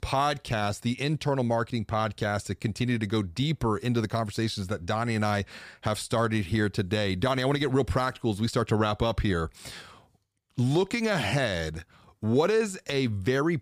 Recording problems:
none

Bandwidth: 15 kHz